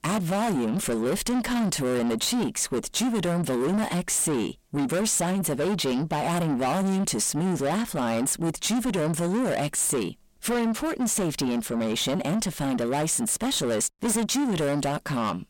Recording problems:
distortion; heavy; 7 dB below the speech

